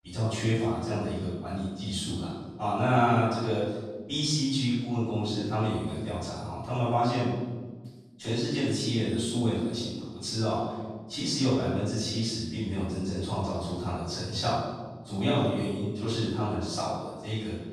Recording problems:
room echo; strong; dies away in 1.3 s
off-mic speech; far

